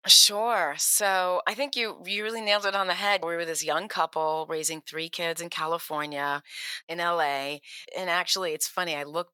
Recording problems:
thin; very; fading below 700 Hz

